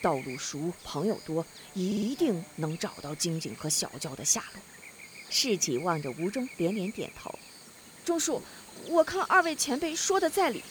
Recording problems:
electrical hum; noticeable; throughout; 60 Hz, 15 dB below the speech
audio stuttering; at 2 s

